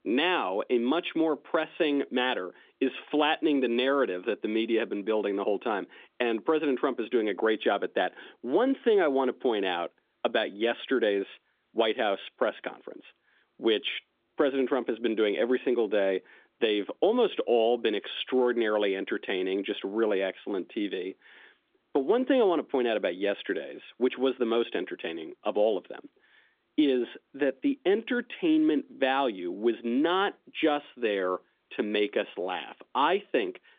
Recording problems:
phone-call audio; nothing above 3.5 kHz

